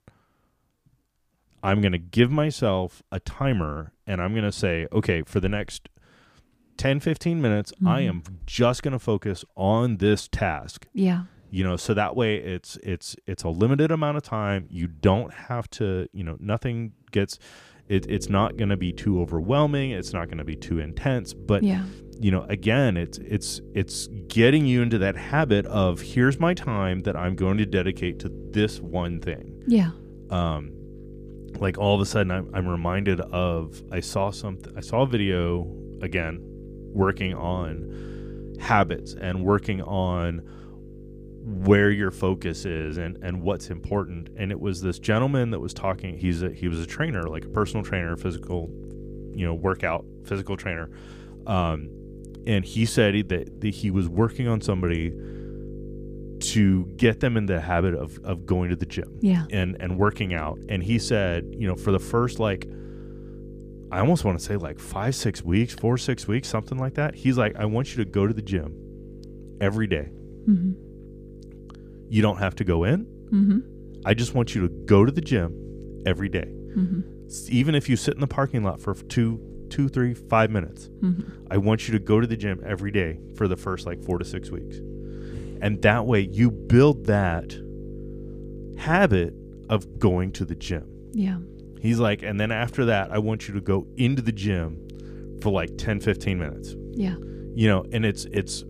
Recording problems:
electrical hum; noticeable; from 18 s on; 50 Hz, 20 dB below the speech

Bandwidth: 15 kHz